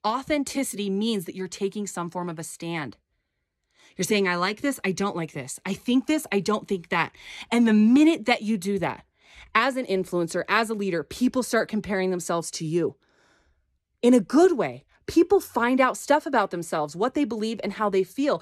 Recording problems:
none

